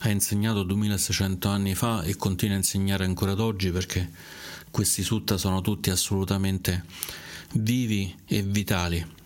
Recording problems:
squashed, flat; somewhat

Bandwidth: 16.5 kHz